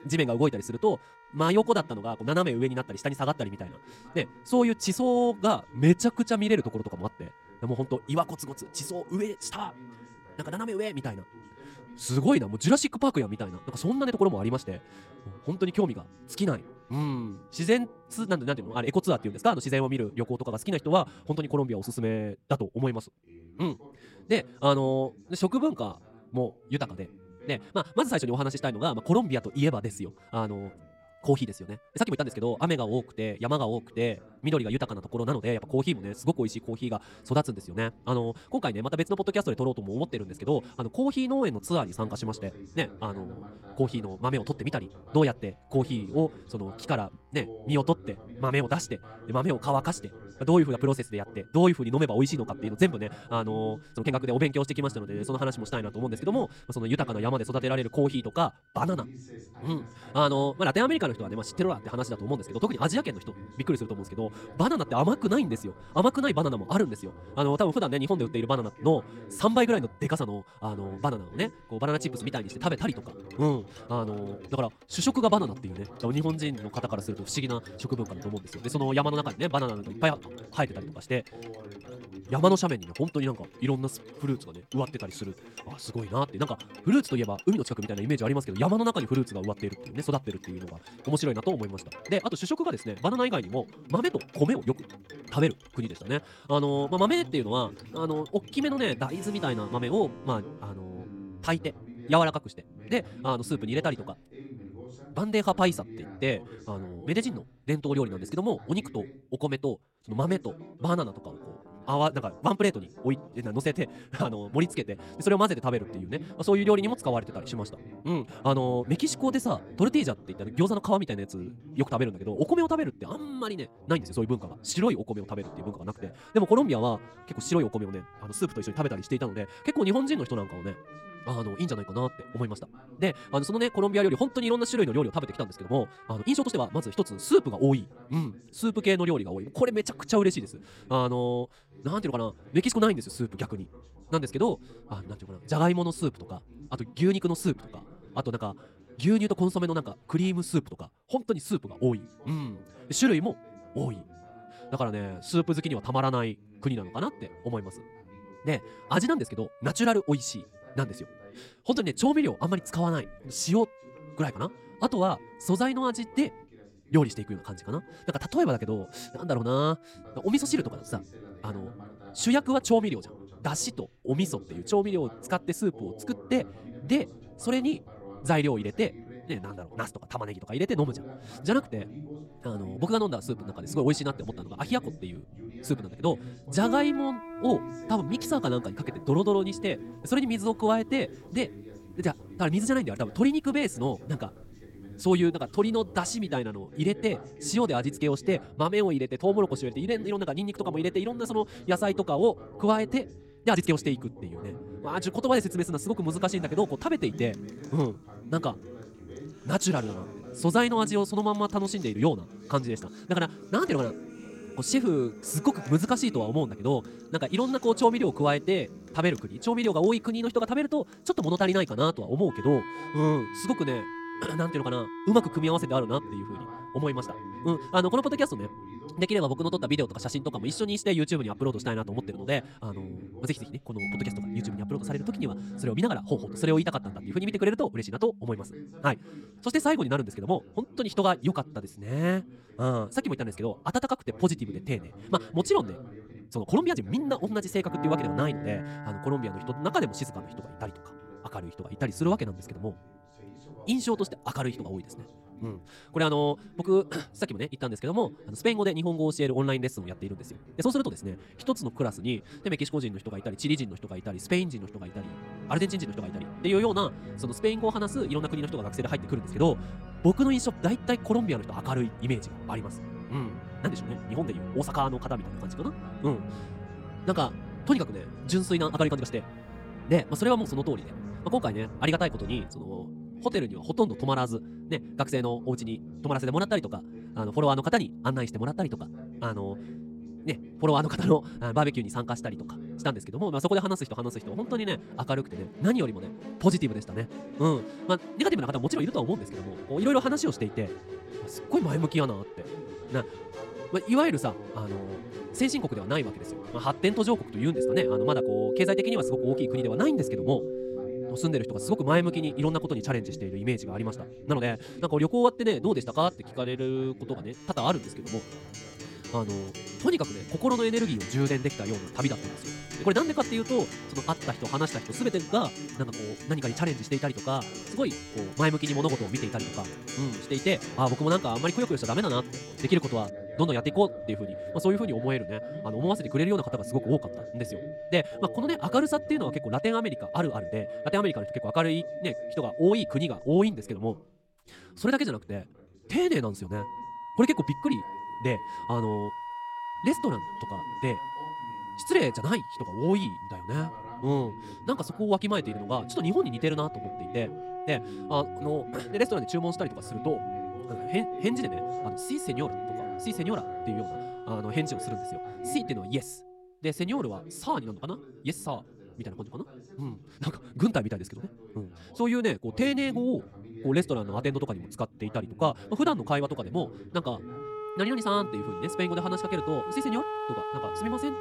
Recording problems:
wrong speed, natural pitch; too fast; 1.6 times normal speed
background music; noticeable; throughout; 10 dB below the speech
voice in the background; noticeable; throughout; 20 dB below the speech
uneven, jittery; strongly; from 14 s to 5:35

